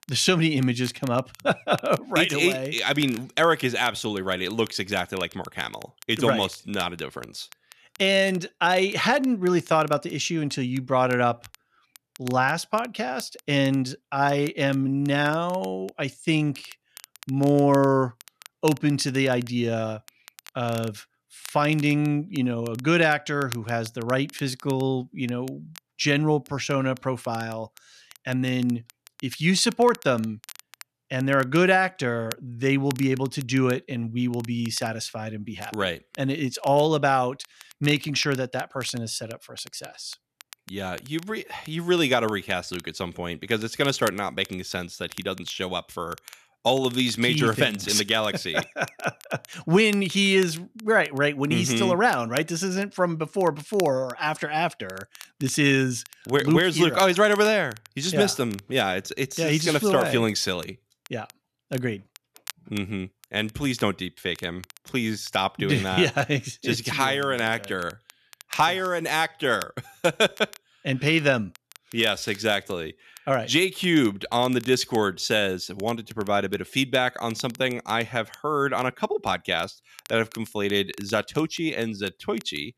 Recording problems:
crackle, like an old record; faint; 20 dB below the speech

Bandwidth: 14 kHz